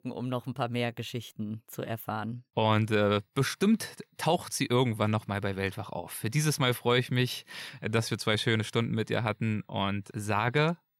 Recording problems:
none

